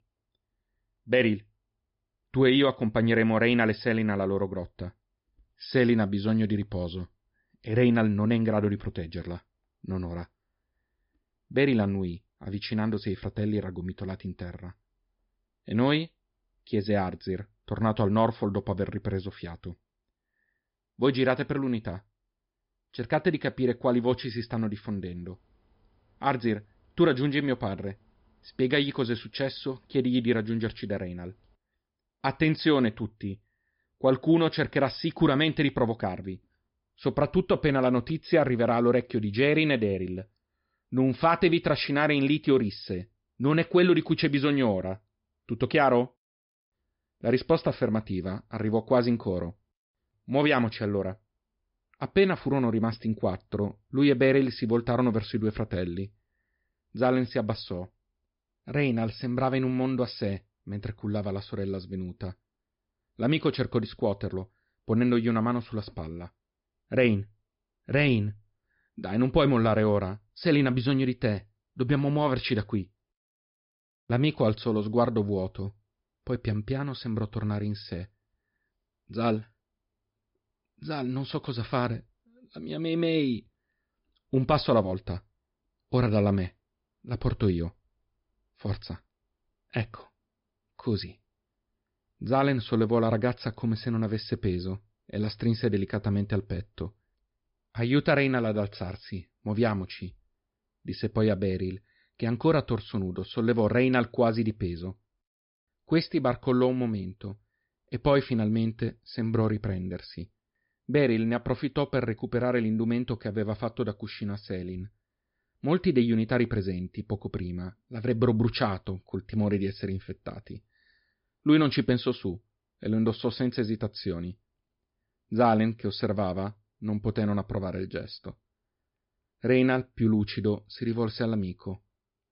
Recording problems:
high frequencies cut off; noticeable; nothing above 5.5 kHz

